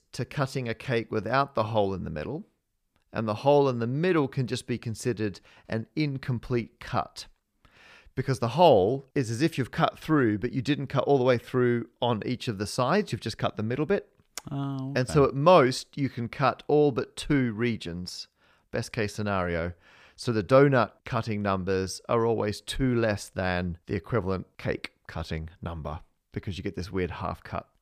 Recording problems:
none

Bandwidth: 15 kHz